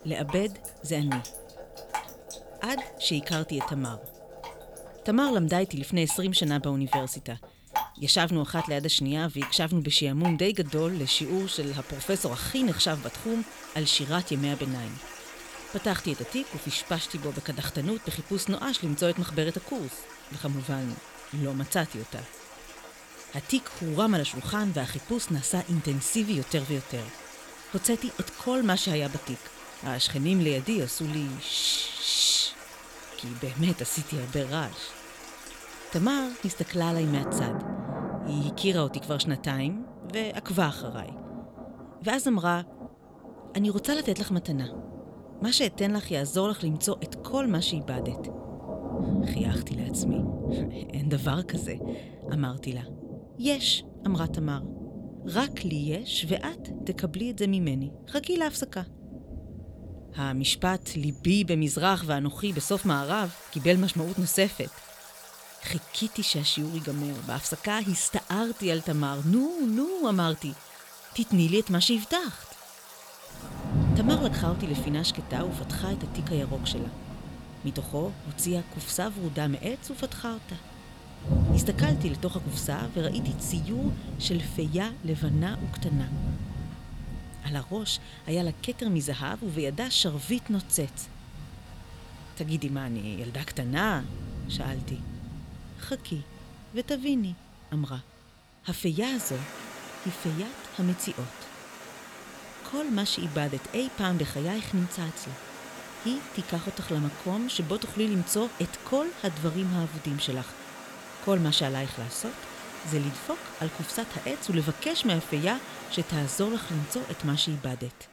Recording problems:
rain or running water; loud; throughout; 10 dB below the speech

